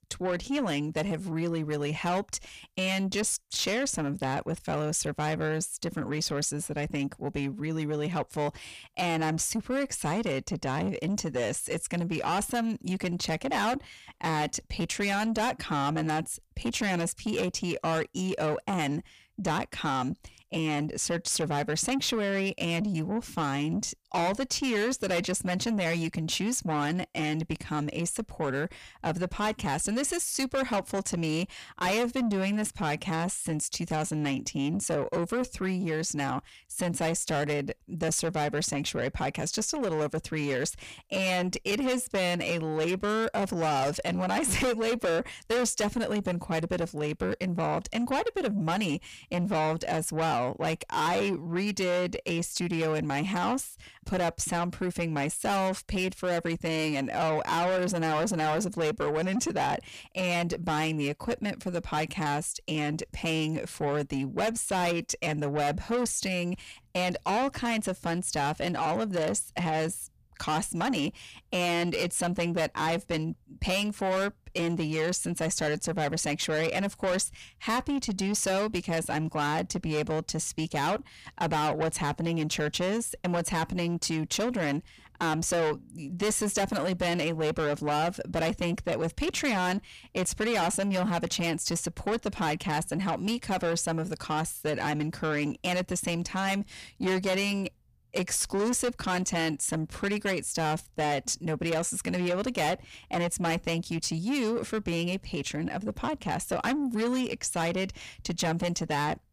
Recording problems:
distortion; heavy; 7 dB below the speech

